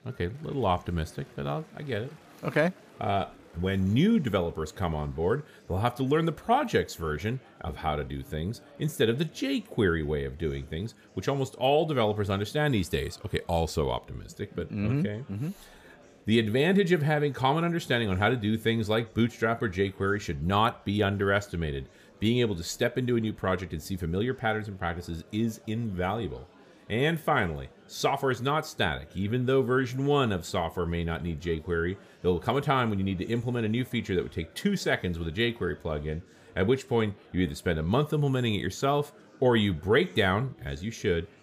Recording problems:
murmuring crowd; faint; throughout; 25 dB below the speech

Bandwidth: 15 kHz